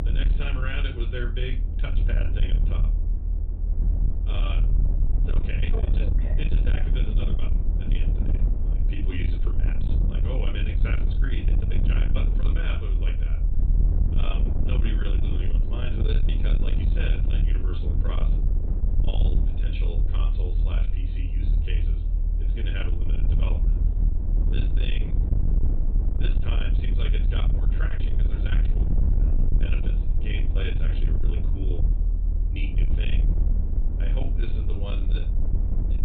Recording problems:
high frequencies cut off; severe; nothing above 4 kHz
distortion; slight; 10 dB below the speech
room echo; very slight; dies away in 0.2 s
off-mic speech; somewhat distant
low rumble; loud; throughout; 5 dB below the speech

